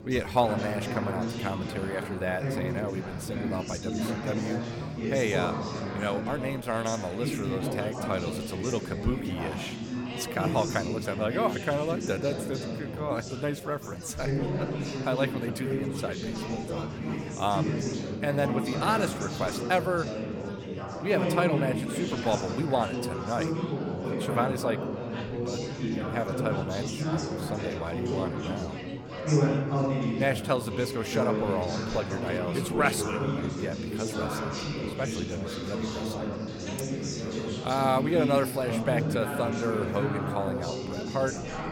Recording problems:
chatter from many people; loud; throughout; 1 dB below the speech

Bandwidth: 17 kHz